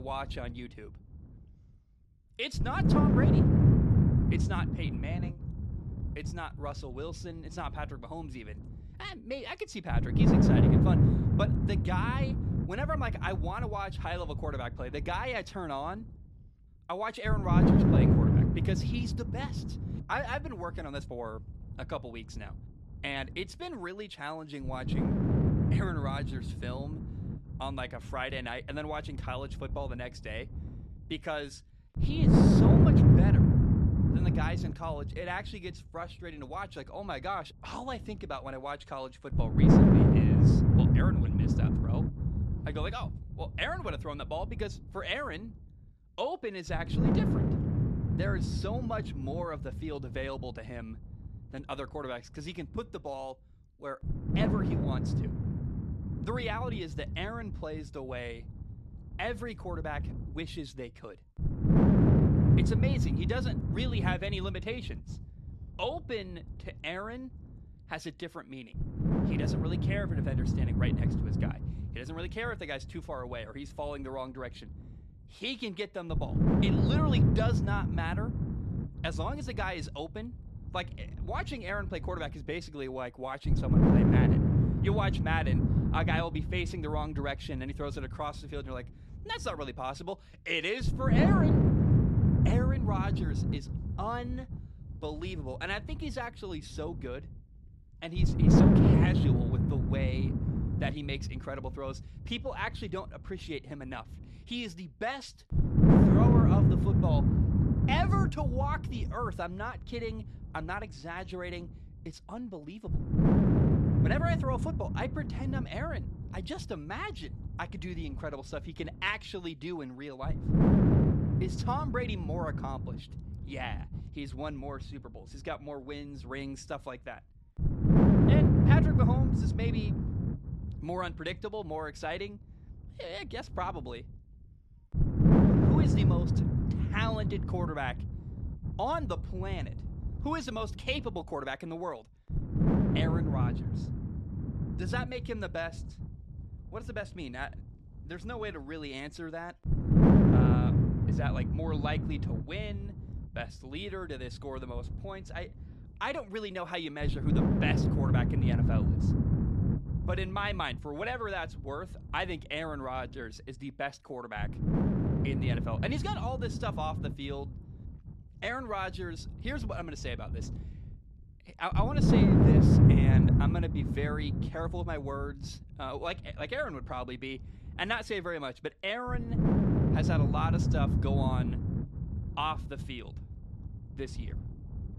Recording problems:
wind noise on the microphone; heavy; 2 dB above the speech
abrupt cut into speech; at the start

